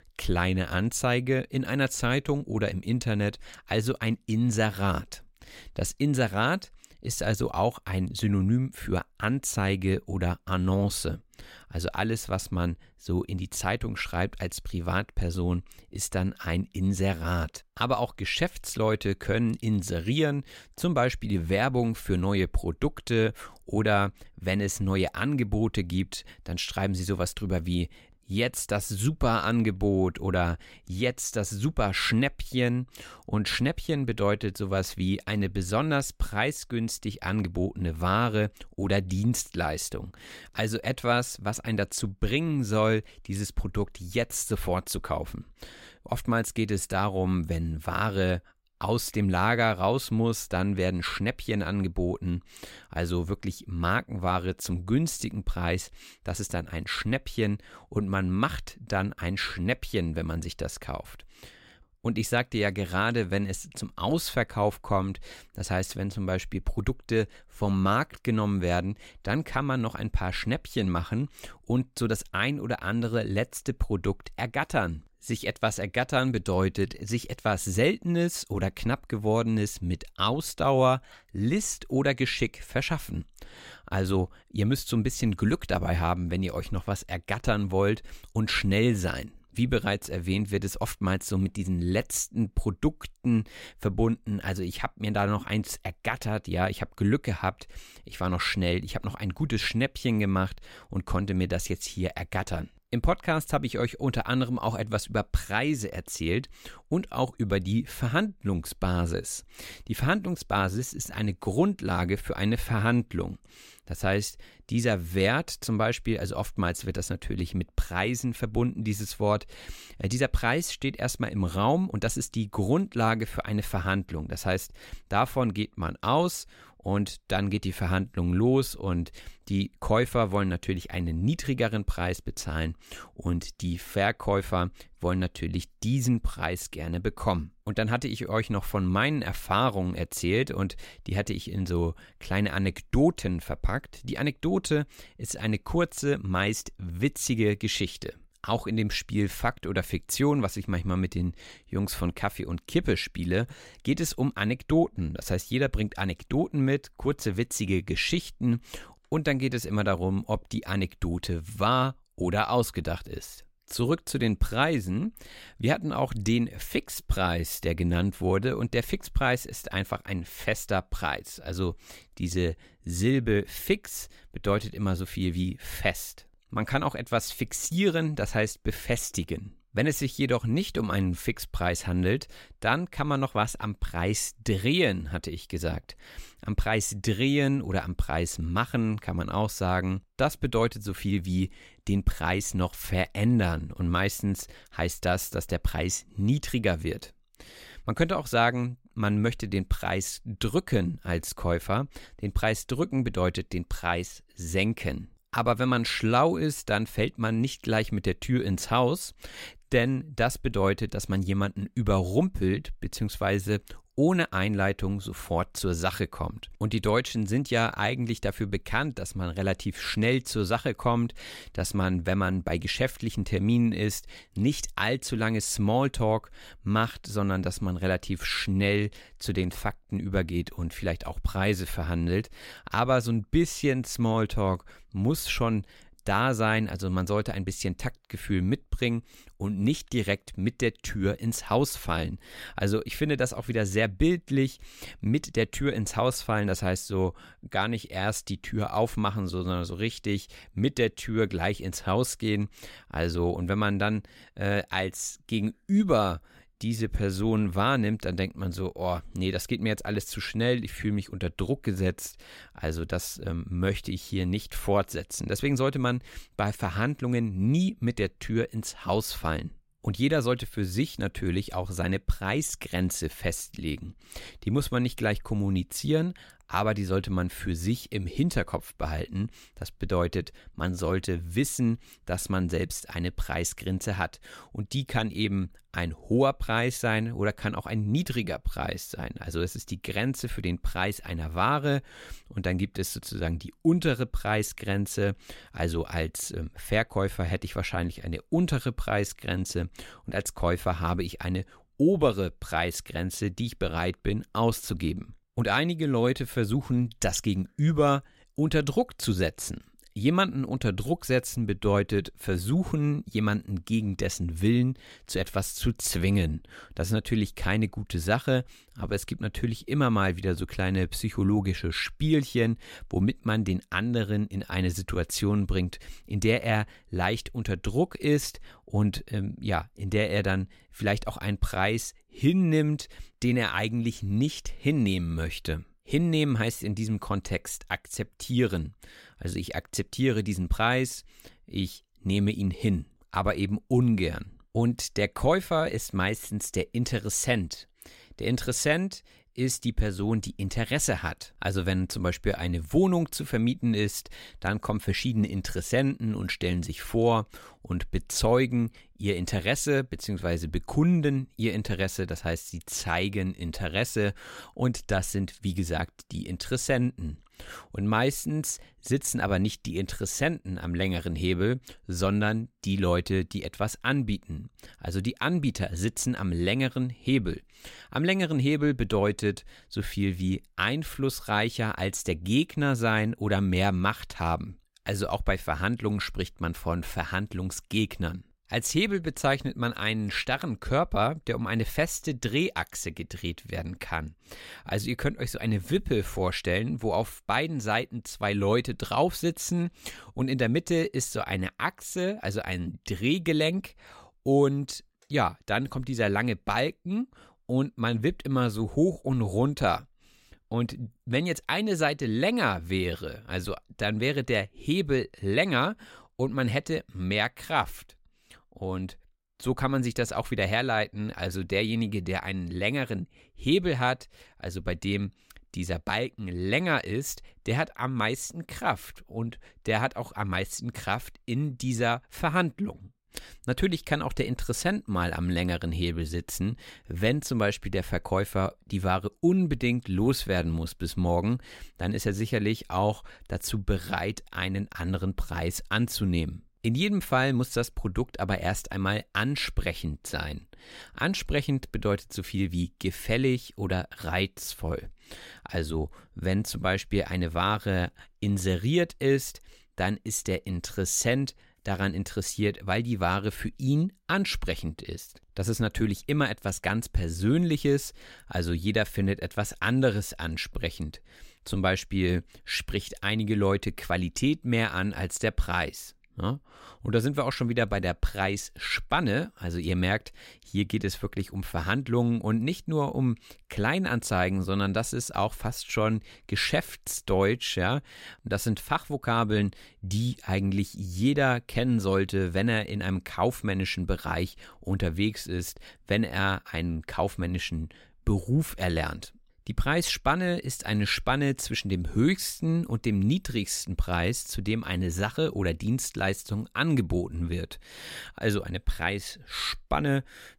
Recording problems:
none

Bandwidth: 16 kHz